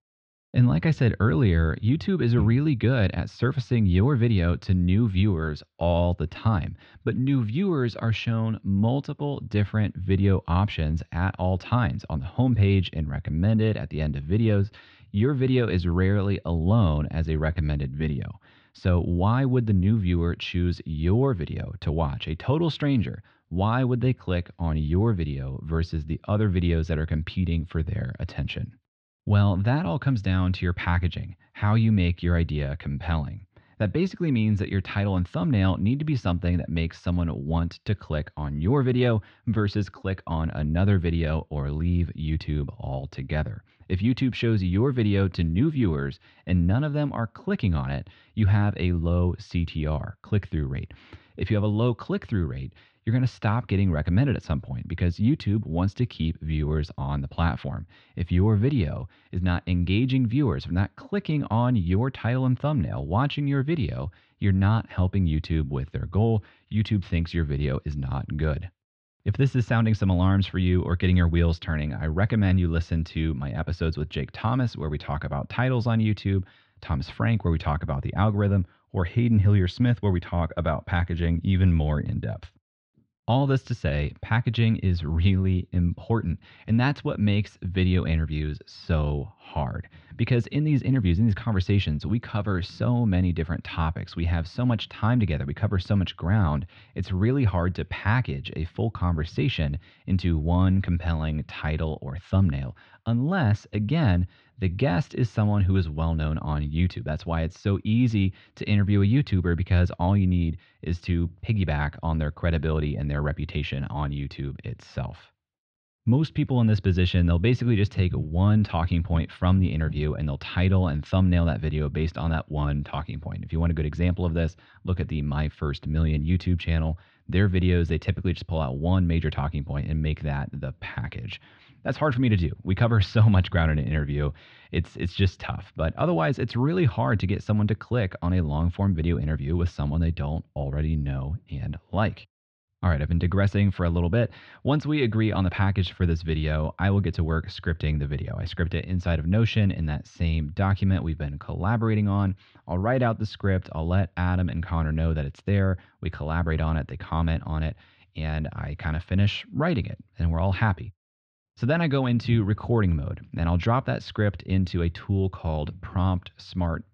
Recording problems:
muffled; slightly; fading above 3.5 kHz

